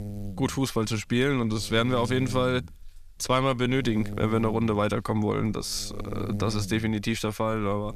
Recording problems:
electrical hum; noticeable; throughout; 60 Hz, 20 dB below the speech

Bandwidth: 14.5 kHz